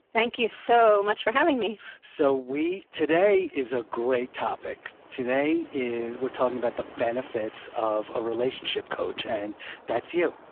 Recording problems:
phone-call audio; poor line
wind in the background; faint; throughout; 20 dB below the speech

